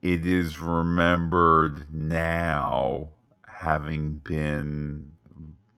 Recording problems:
wrong speed, natural pitch; too slow; 0.5 times normal speed

